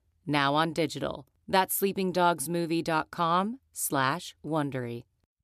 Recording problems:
none

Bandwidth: 14 kHz